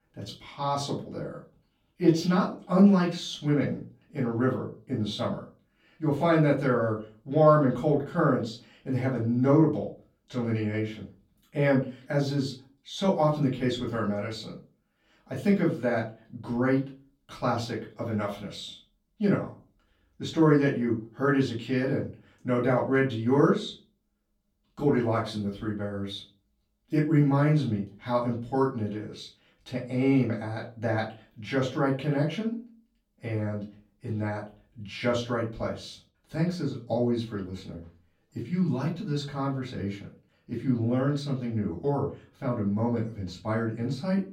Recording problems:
off-mic speech; far
room echo; slight; dies away in 0.3 s

